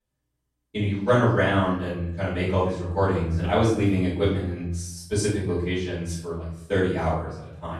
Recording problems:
off-mic speech; far
room echo; noticeable; dies away in 0.6 s
echo of what is said; faint; throughout; 130 ms later, 20 dB below the speech

